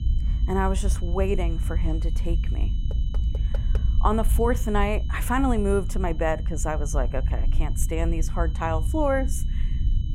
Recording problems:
low rumble; noticeable; throughout; 20 dB below the speech
high-pitched whine; faint; throughout; 3 kHz, 25 dB below the speech
door banging; faint; at 3 s; peak 15 dB below the speech

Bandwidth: 16 kHz